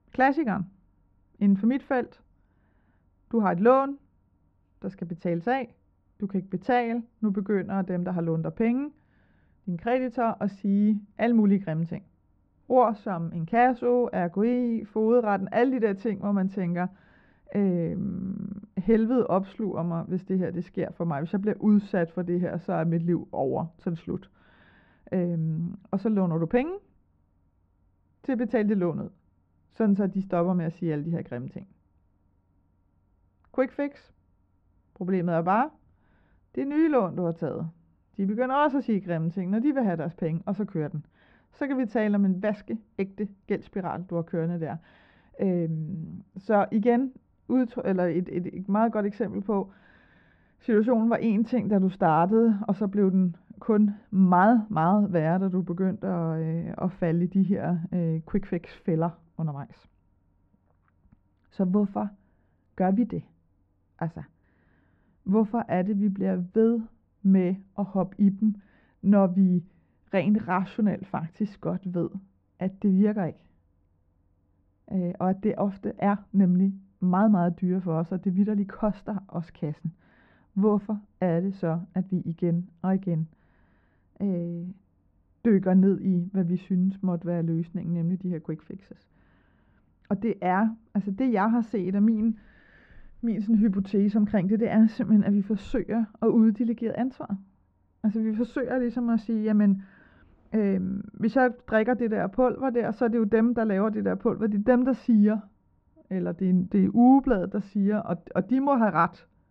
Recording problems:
muffled; very; fading above 1.5 kHz

